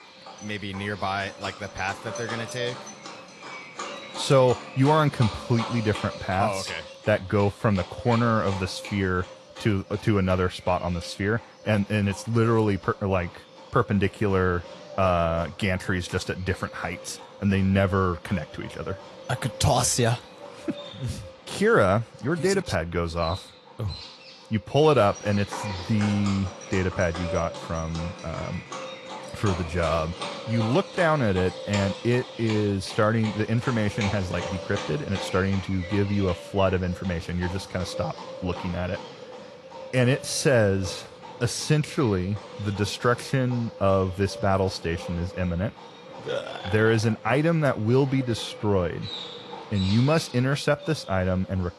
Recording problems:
garbled, watery; slightly; nothing above 11.5 kHz
animal sounds; noticeable; throughout; 15 dB below the speech

